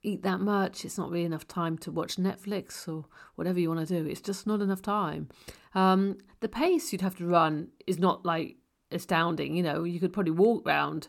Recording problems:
none

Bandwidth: 18 kHz